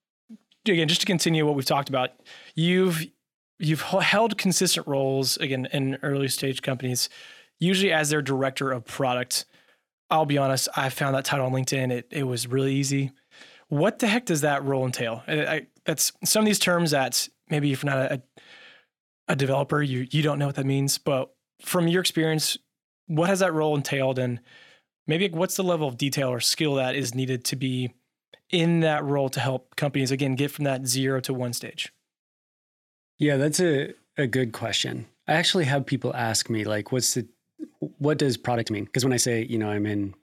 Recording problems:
uneven, jittery; strongly; from 3.5 to 39 s

